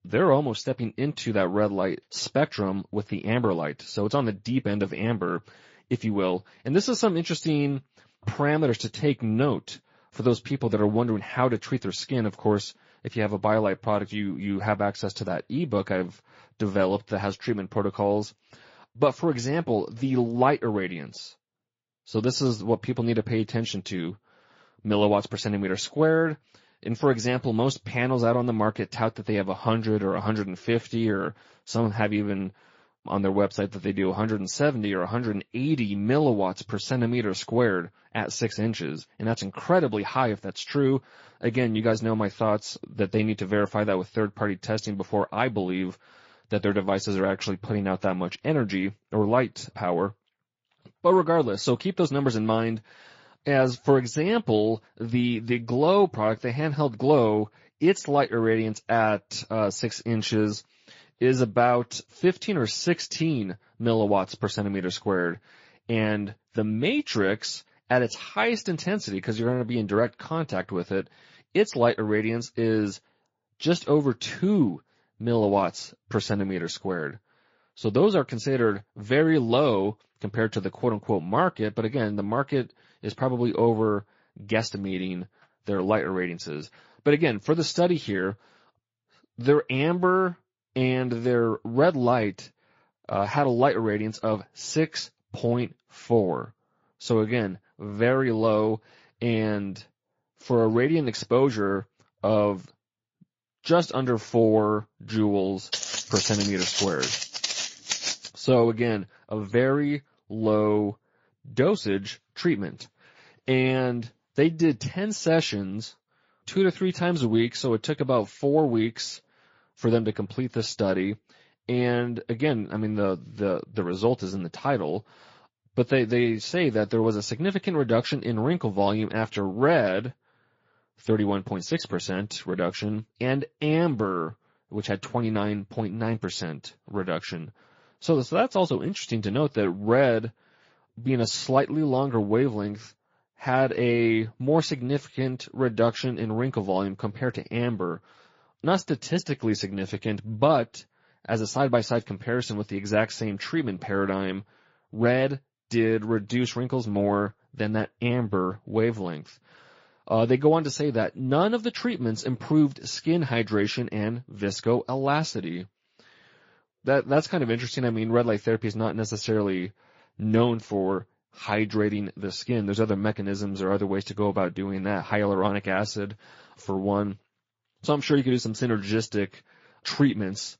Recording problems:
garbled, watery; slightly; nothing above 7.5 kHz
high frequencies cut off; slight
footsteps; noticeable; from 1:46 to 1:48; peak level with the speech

